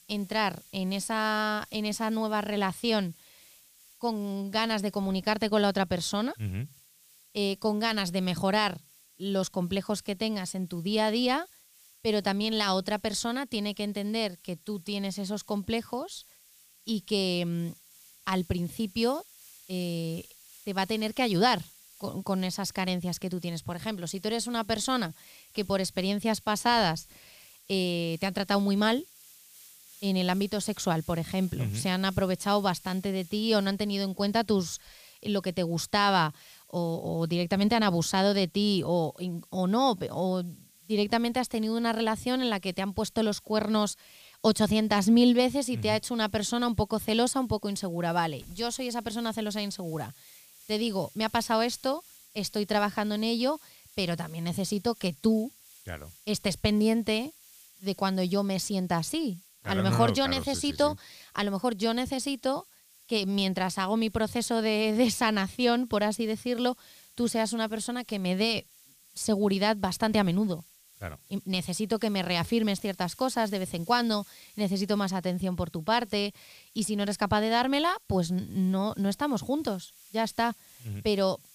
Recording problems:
hiss; faint; throughout; 25 dB below the speech

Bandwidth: 15 kHz